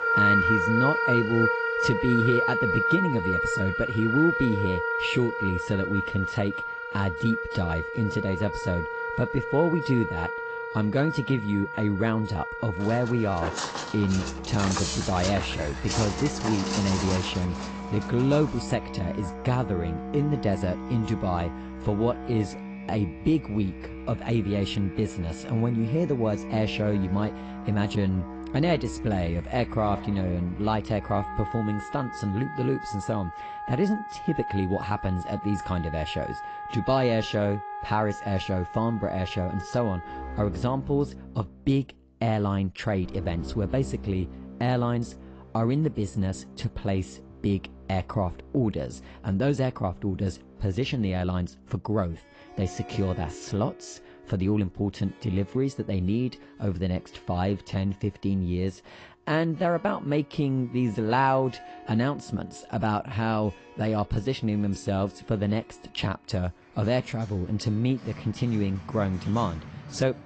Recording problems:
high frequencies cut off; noticeable; nothing above 8 kHz
garbled, watery; slightly
background music; loud; throughout; 4 dB below the speech
footsteps; noticeable; from 13 to 19 s; peak 1 dB below the speech

